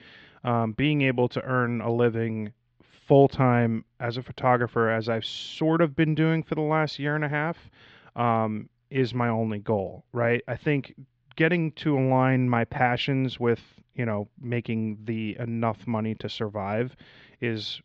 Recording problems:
muffled; very slightly; fading above 3.5 kHz
high frequencies cut off; slight; nothing above 8 kHz

